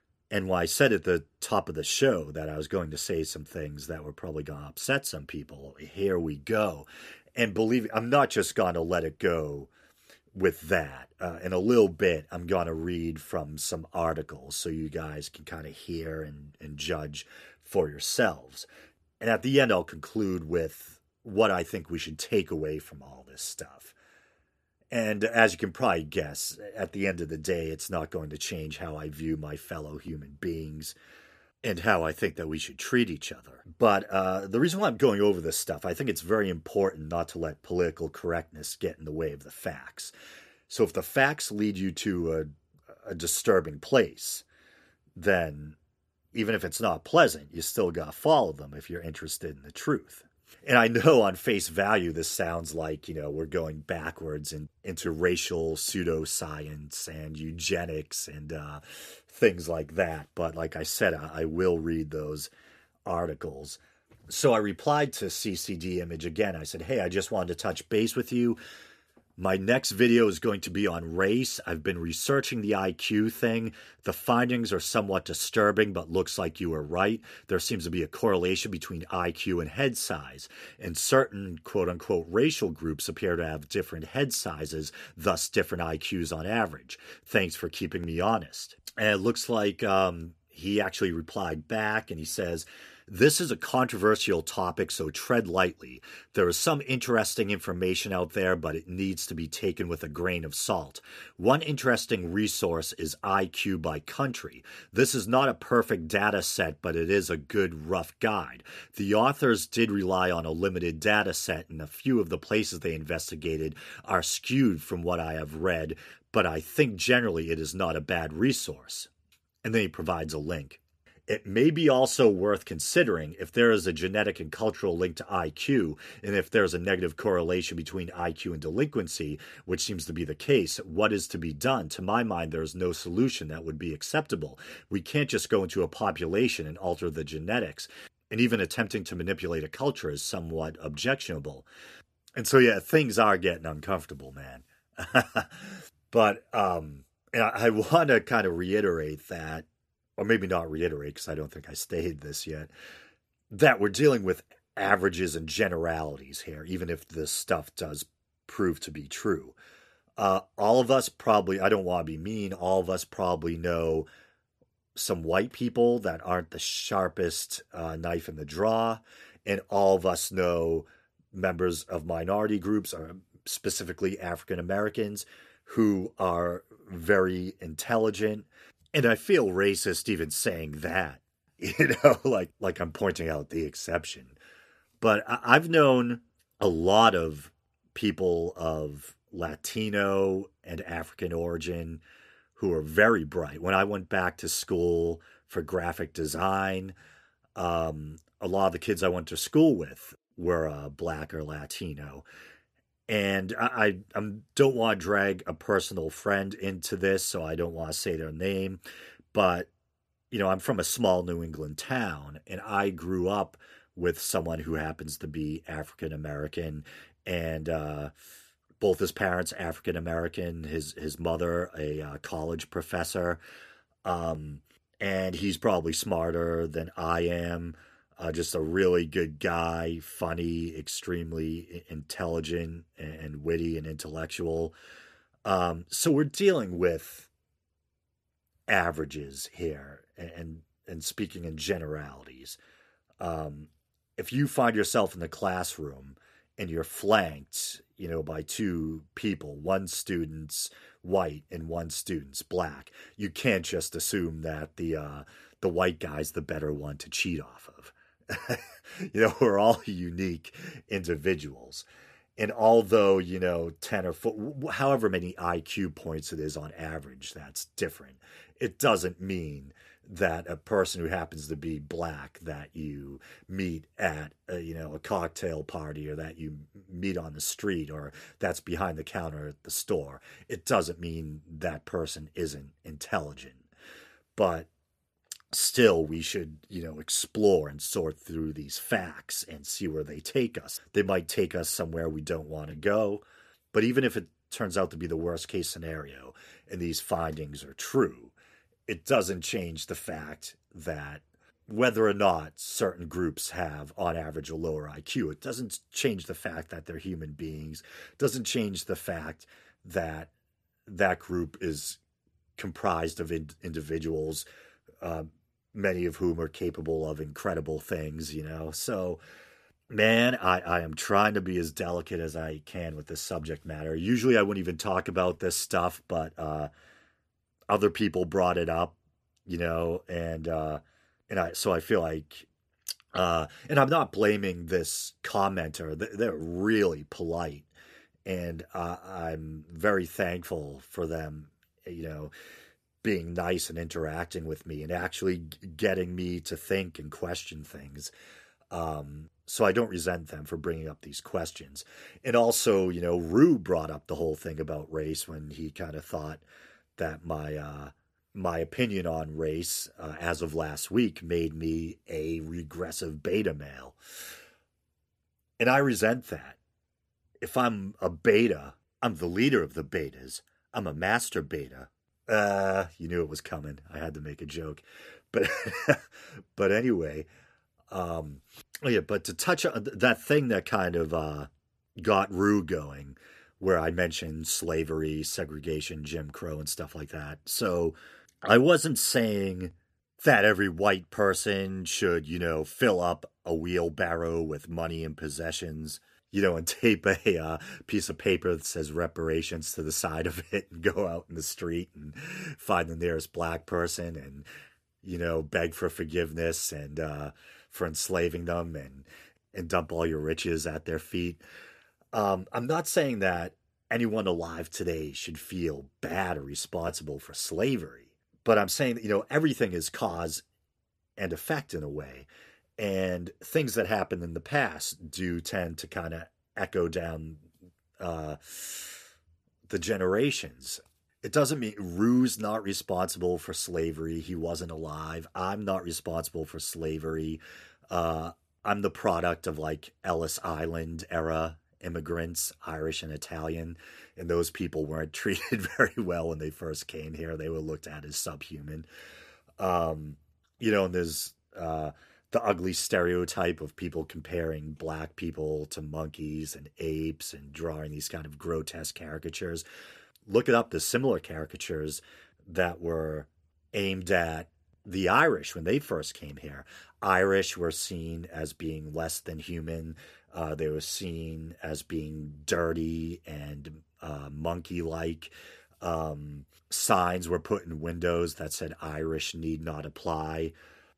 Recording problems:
none

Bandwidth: 14.5 kHz